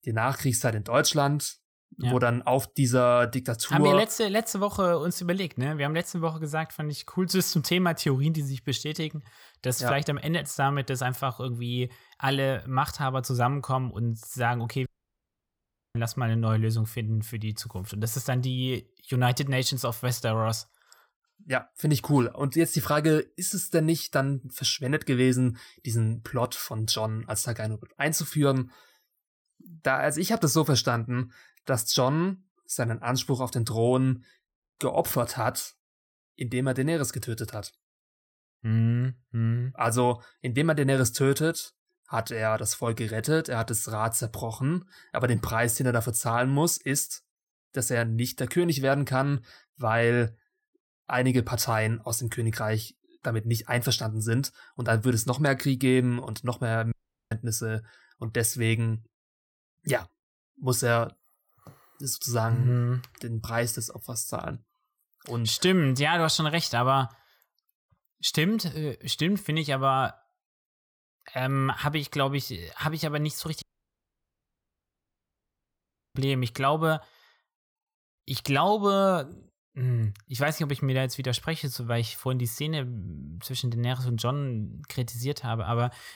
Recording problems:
audio cutting out; at 15 s for 1 s, at 57 s and at 1:14 for 2.5 s

